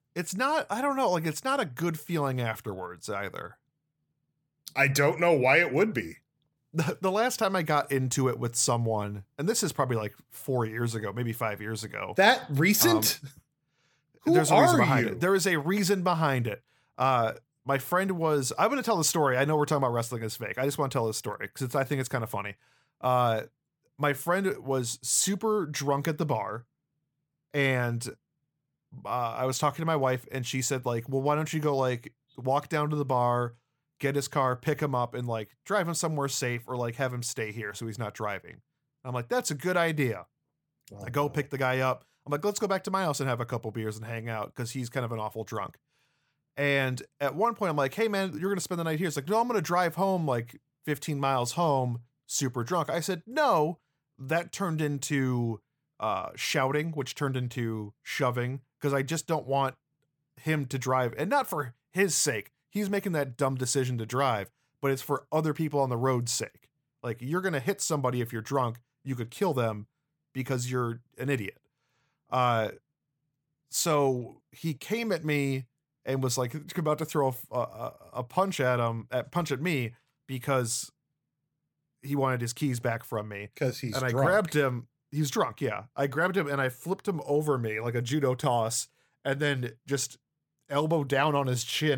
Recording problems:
abrupt cut into speech; at the end

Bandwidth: 18 kHz